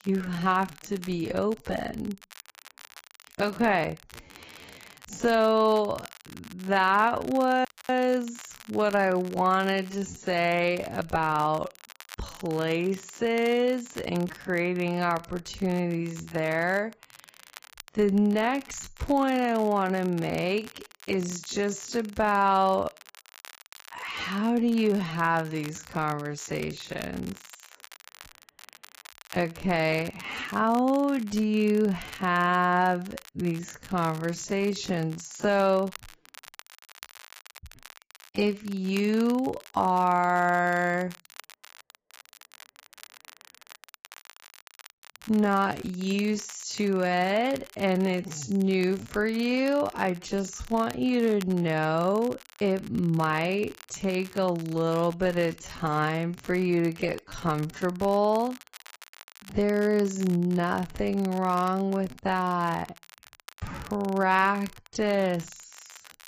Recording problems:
garbled, watery; badly; nothing above 7.5 kHz
wrong speed, natural pitch; too slow; 0.5 times normal speed
crackle, like an old record; faint; 20 dB below the speech
audio freezing; at 7.5 s

